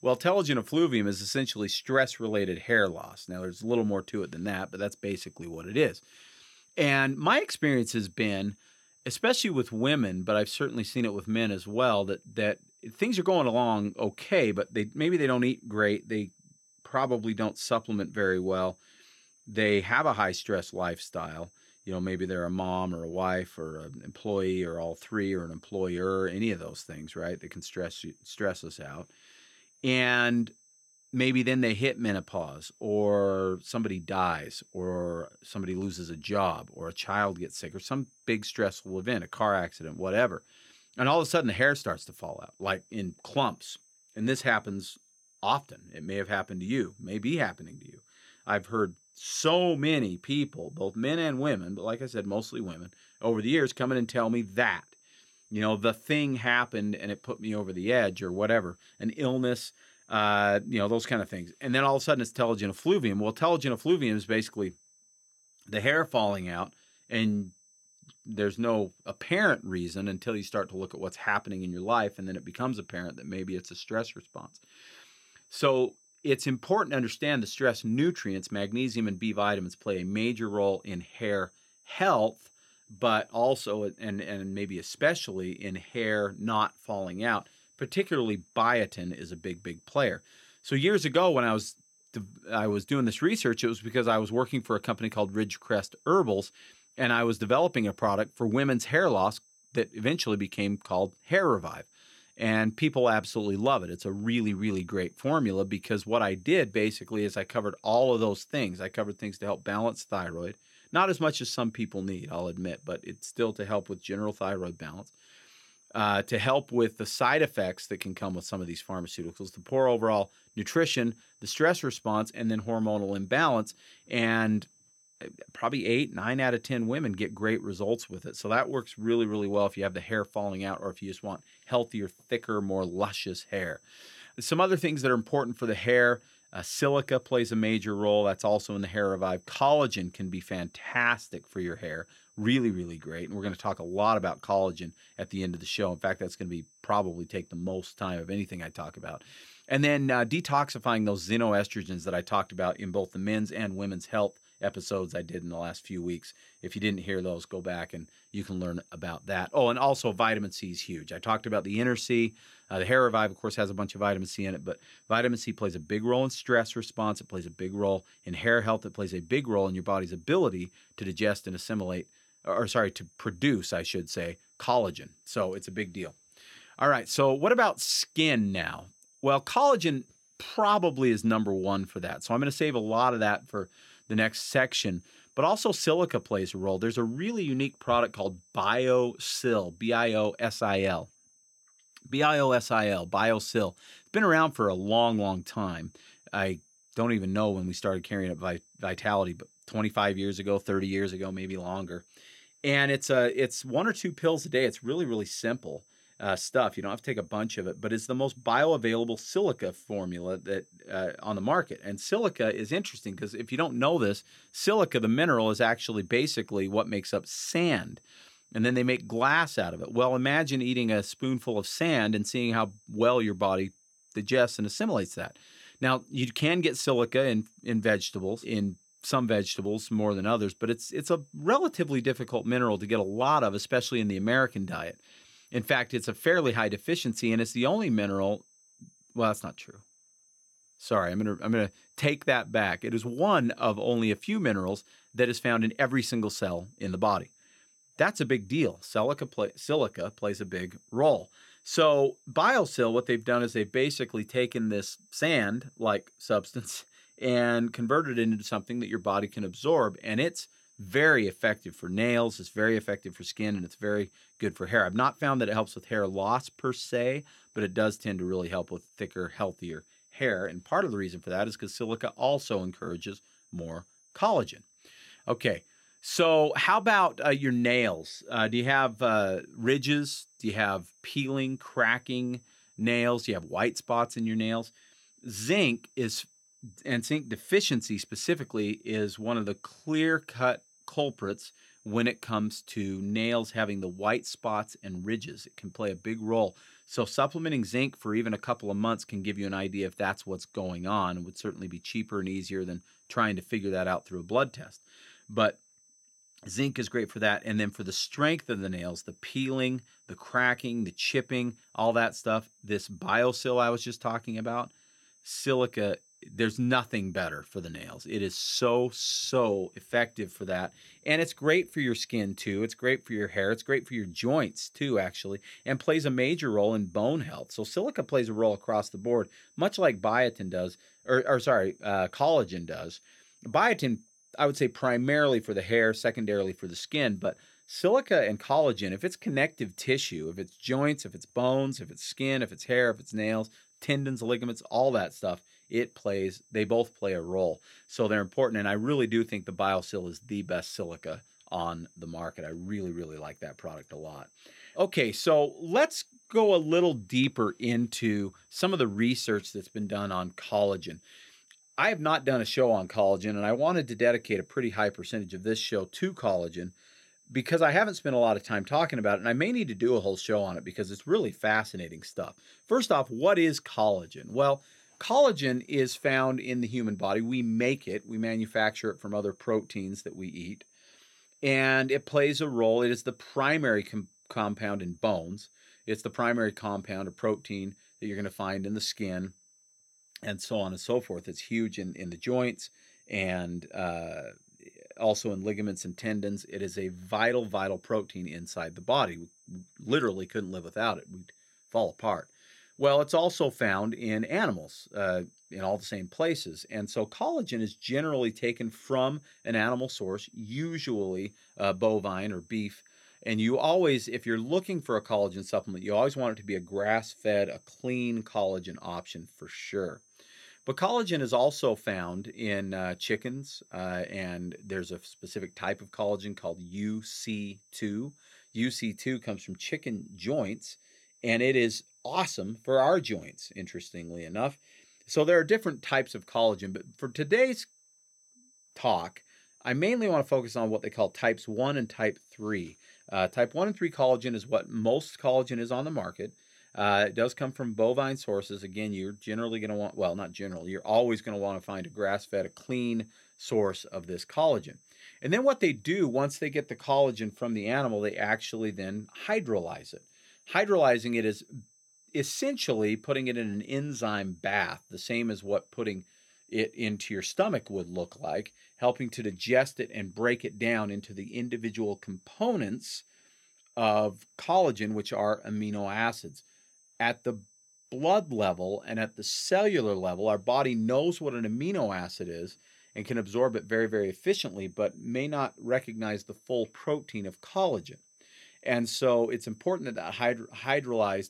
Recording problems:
high-pitched whine; faint; throughout; 6 kHz, 30 dB below the speech

